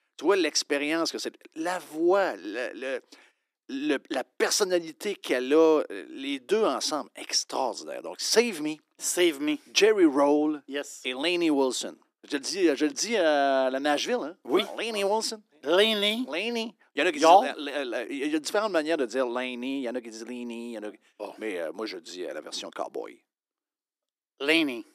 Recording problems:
thin; somewhat; fading below 300 Hz

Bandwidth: 14.5 kHz